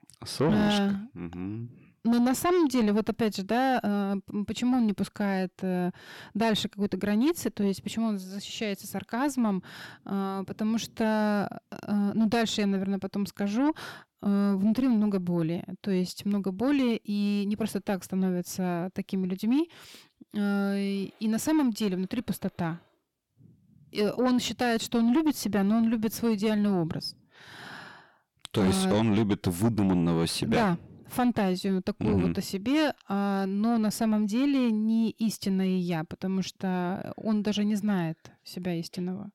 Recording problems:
distortion; slight; 10 dB below the speech

